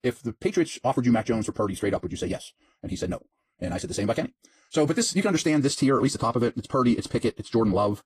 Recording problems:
wrong speed, natural pitch; too fast; 1.7 times normal speed
garbled, watery; slightly; nothing above 15.5 kHz

